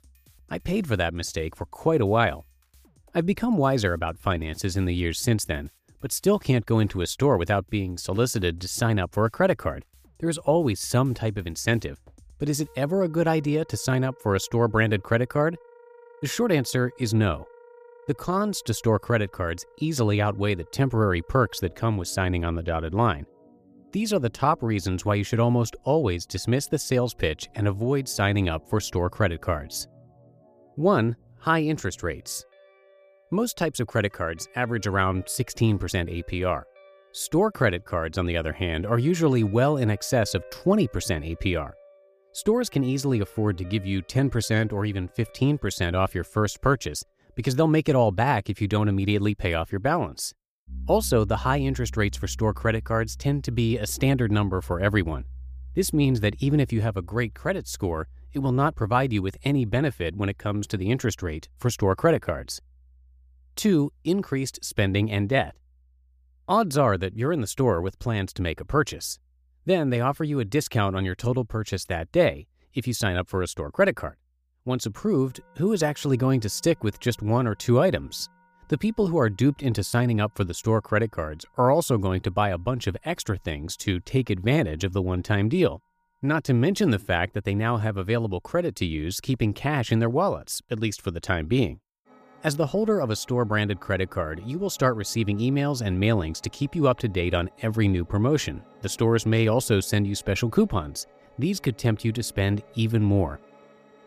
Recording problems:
background music; faint; throughout; 25 dB below the speech

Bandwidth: 15 kHz